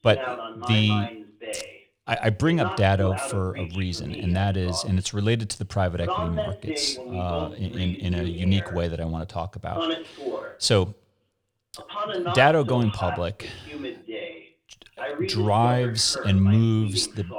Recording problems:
voice in the background; loud; throughout; 9 dB below the speech

